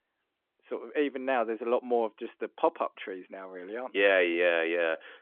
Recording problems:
phone-call audio; nothing above 3.5 kHz

